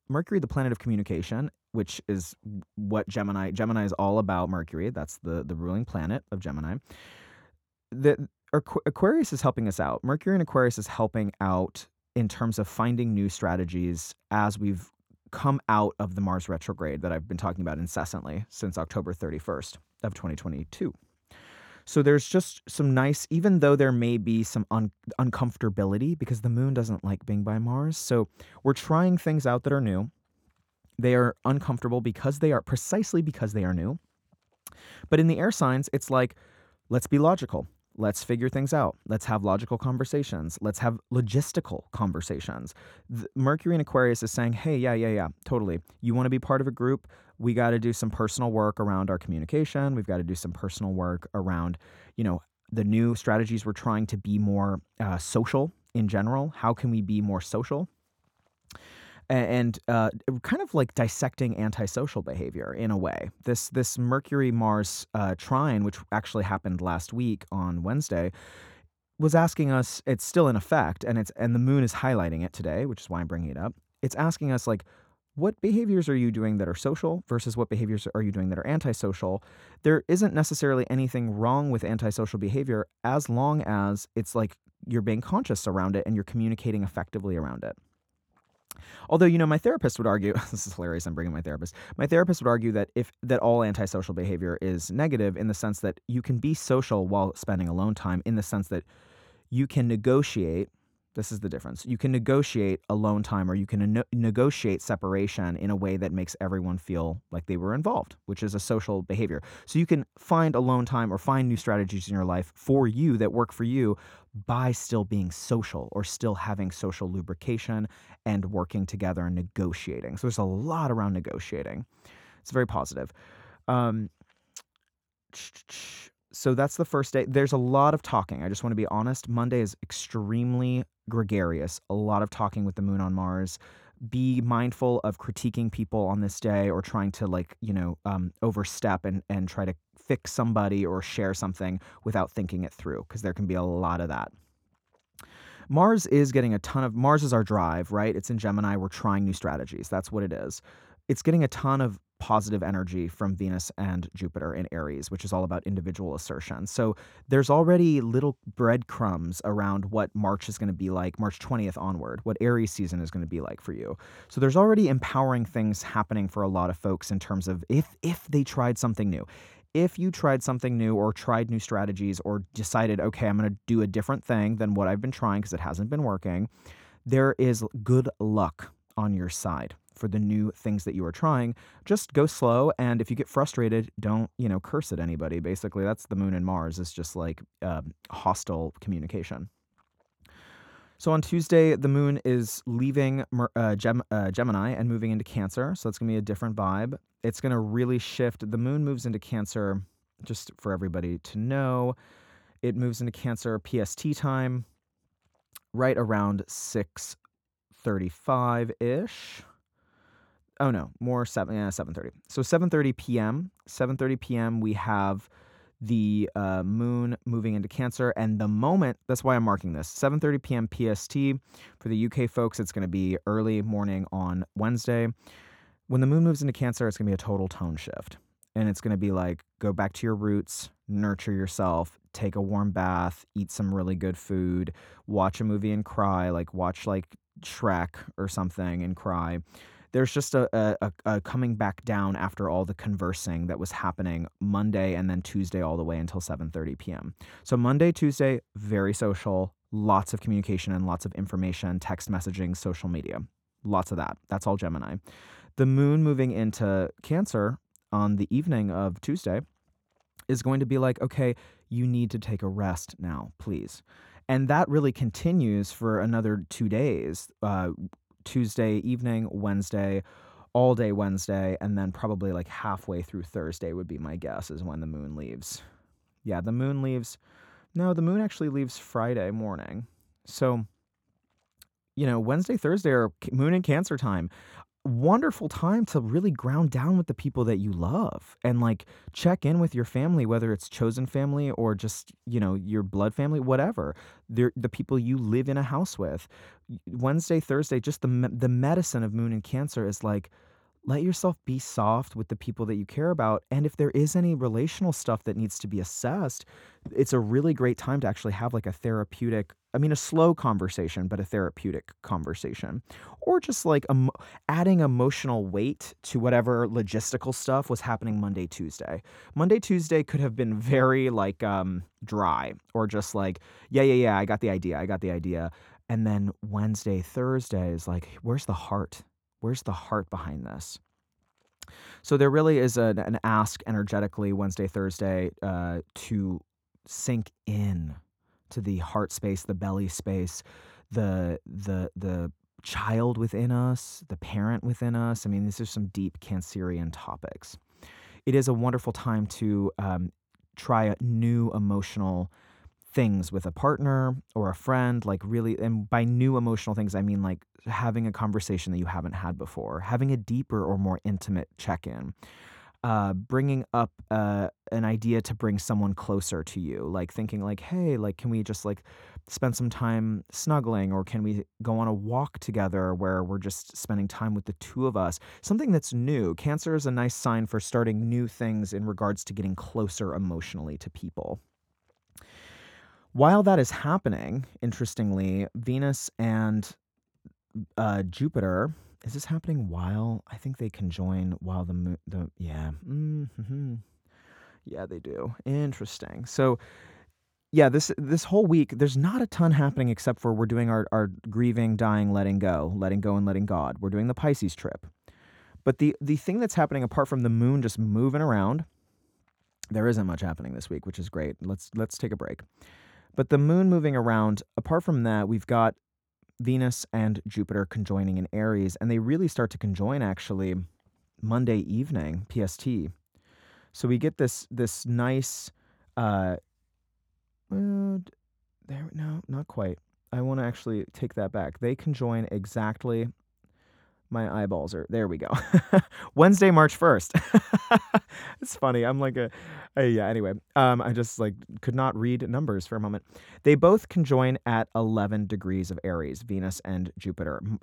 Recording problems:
none

